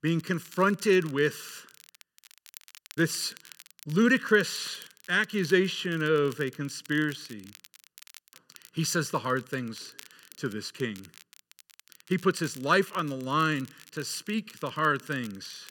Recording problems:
crackle, like an old record; faint; 25 dB below the speech

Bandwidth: 17 kHz